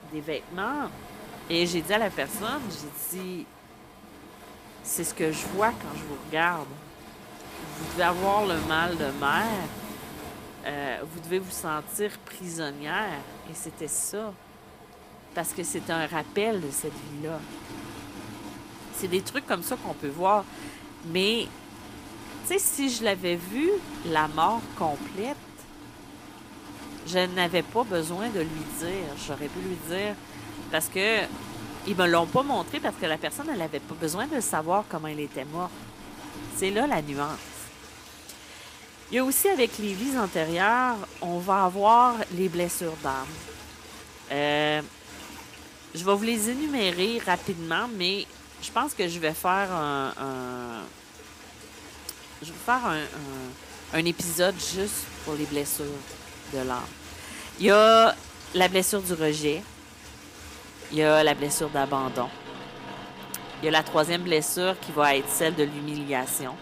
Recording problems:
rain or running water; noticeable; throughout; 15 dB below the speech

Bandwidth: 15 kHz